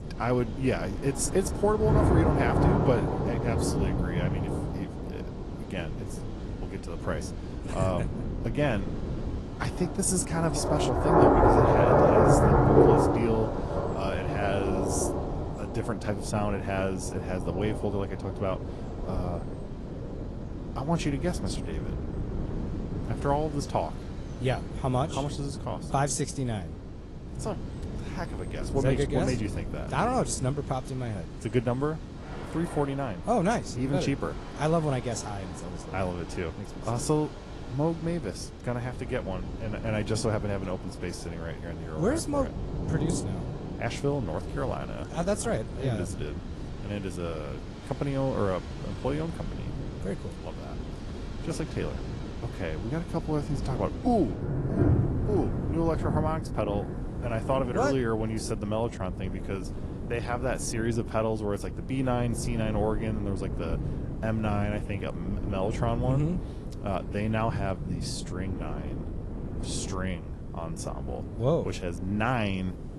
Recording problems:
garbled, watery; slightly
rain or running water; very loud; throughout; 1 dB above the speech
wind noise on the microphone; occasional gusts; 15 dB below the speech

